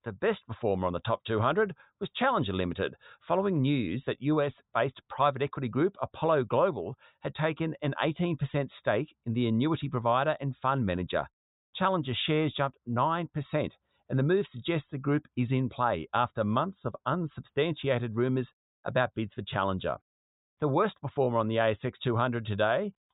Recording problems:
high frequencies cut off; severe; nothing above 4 kHz

